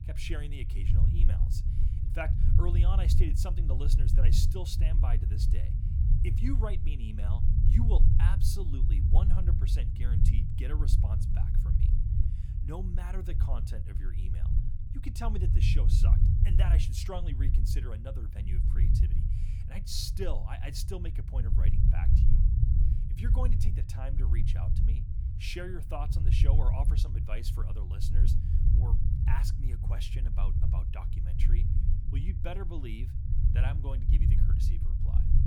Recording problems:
low rumble; loud; throughout; 3 dB below the speech

